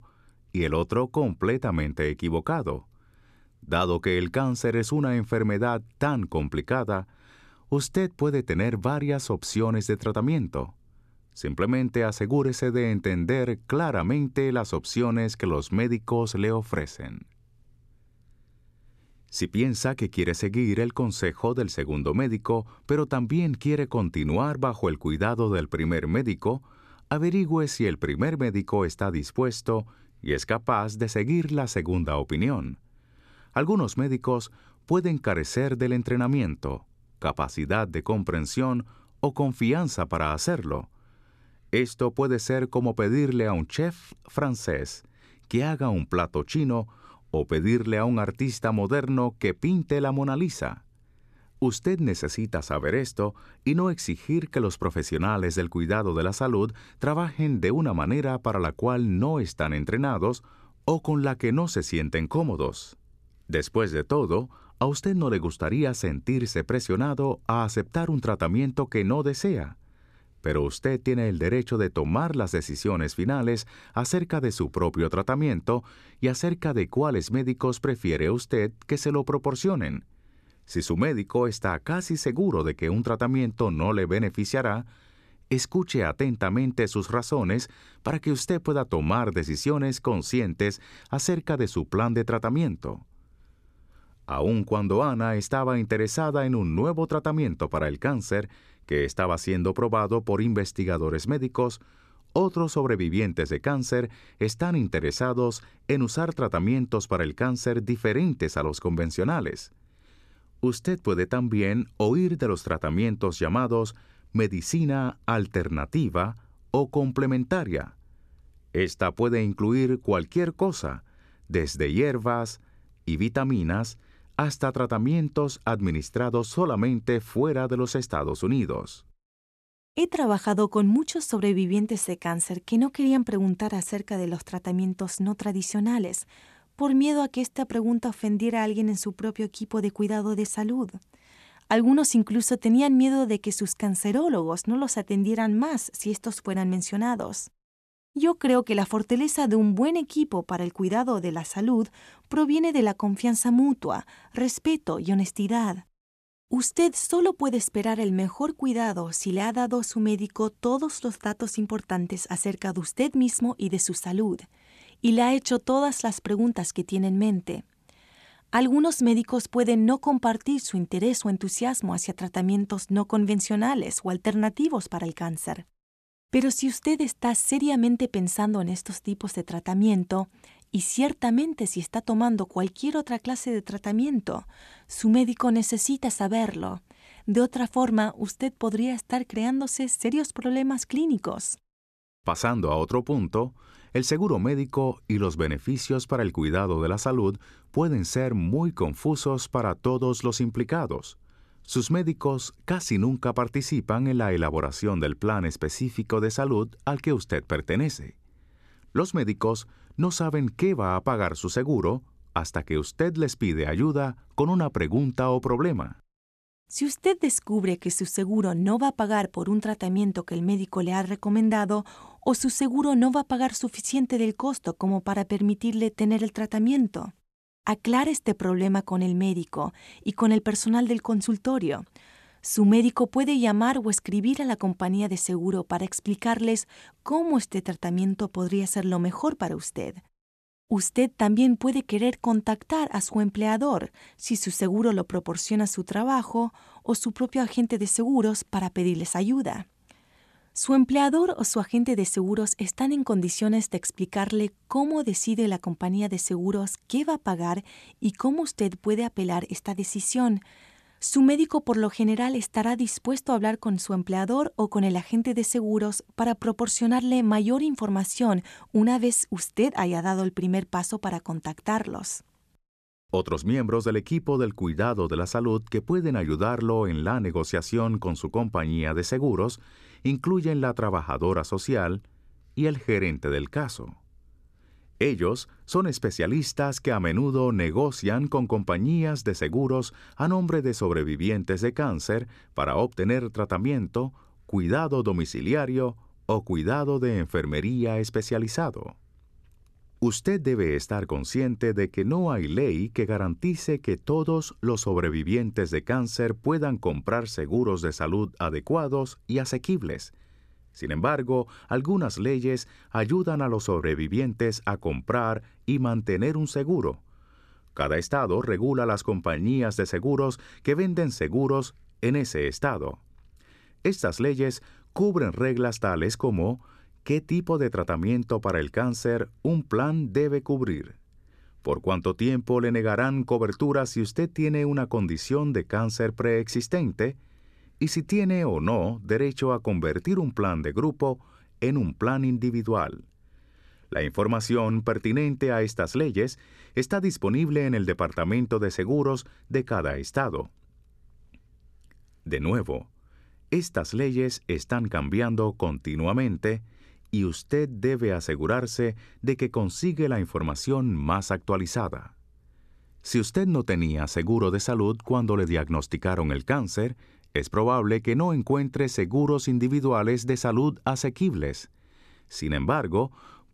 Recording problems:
none

